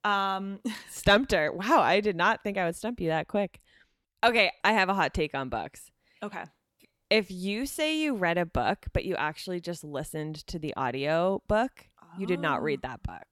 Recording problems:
none

